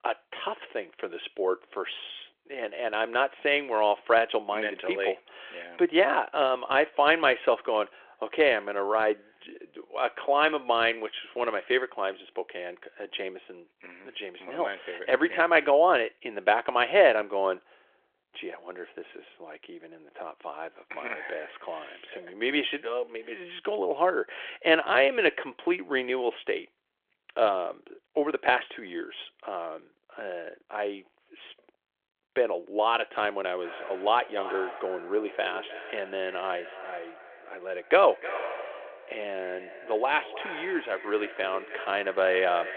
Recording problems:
echo of what is said; noticeable; from 34 s on; 310 ms later, 15 dB below the speech
phone-call audio

